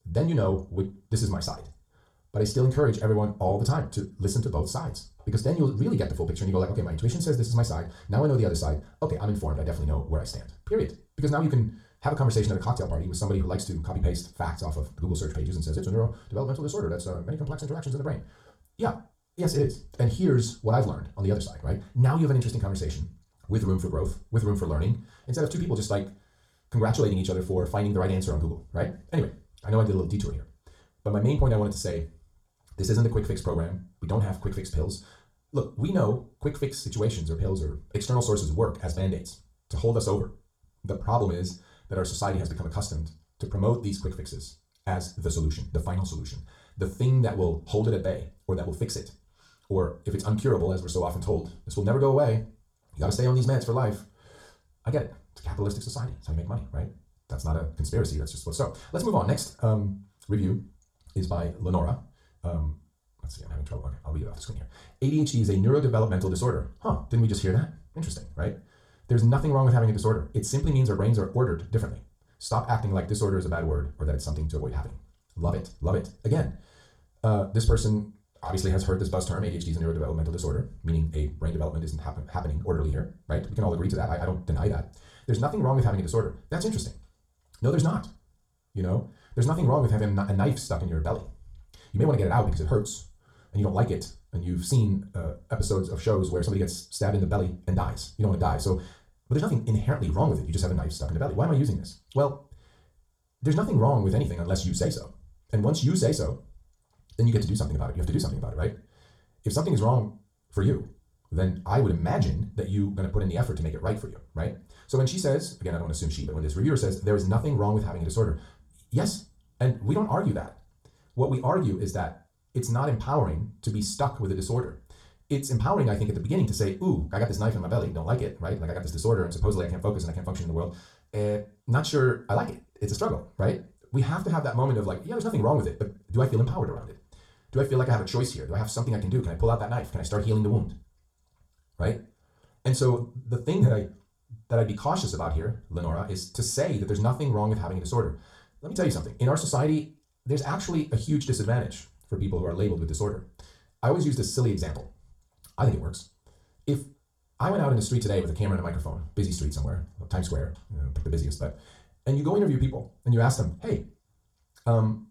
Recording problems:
off-mic speech; far
wrong speed, natural pitch; too fast; 1.7 times normal speed
room echo; very slight; dies away in 0.3 s

